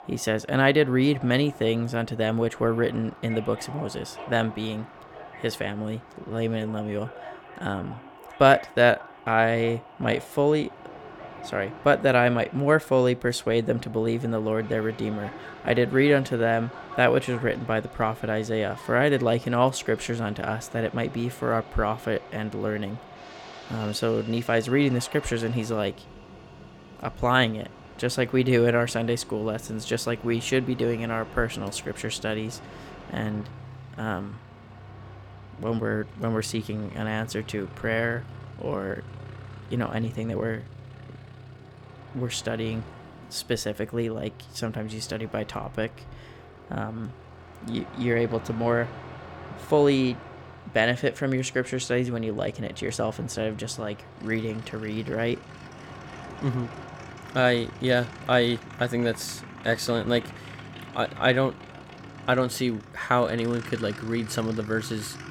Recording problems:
train or aircraft noise; noticeable; throughout; 15 dB below the speech

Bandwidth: 17 kHz